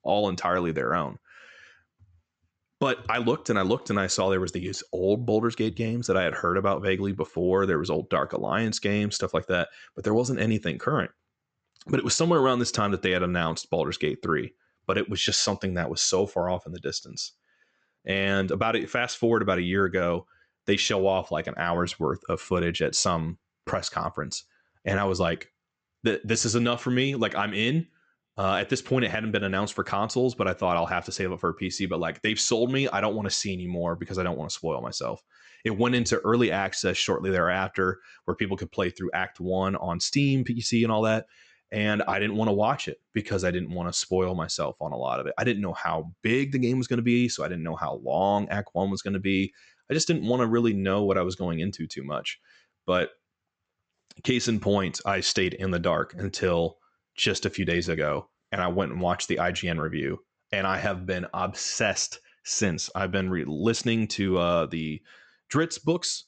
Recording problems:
high frequencies cut off; noticeable; nothing above 8 kHz

